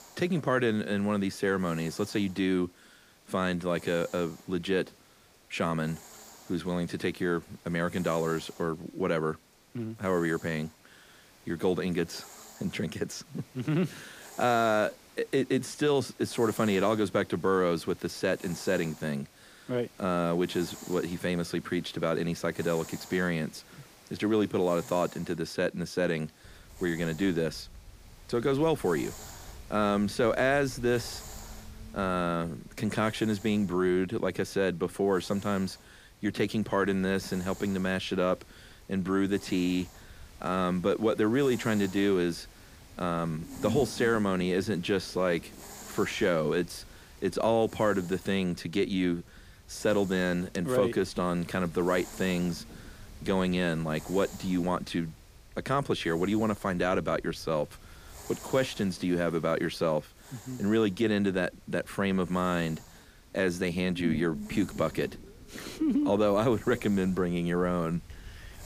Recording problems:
hiss; faint; throughout; 20 dB below the speech
low rumble; faint; from 26 s on; 20 dB below the speech

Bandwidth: 15 kHz